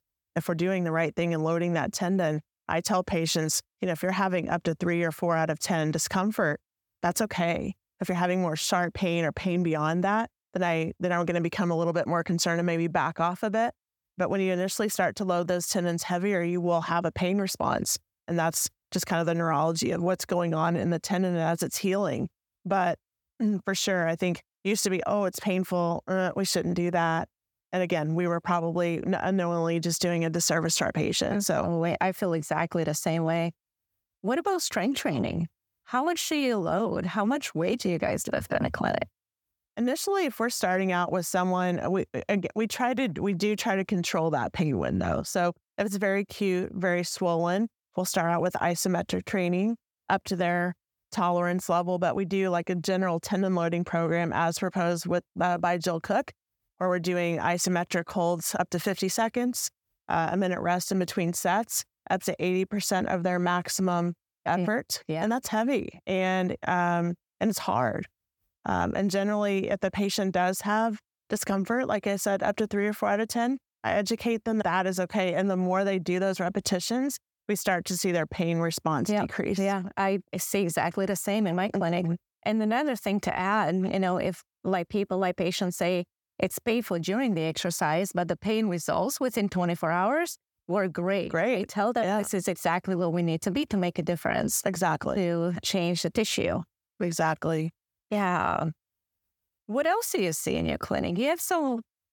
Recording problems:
none

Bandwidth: 18 kHz